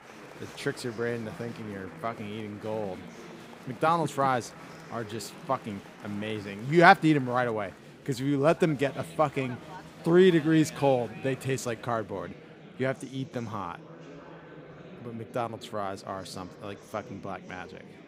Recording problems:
murmuring crowd; noticeable; throughout; 20 dB below the speech

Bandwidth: 15.5 kHz